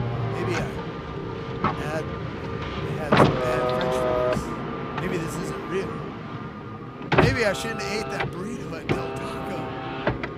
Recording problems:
traffic noise; very loud; throughout; 5 dB above the speech

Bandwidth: 15.5 kHz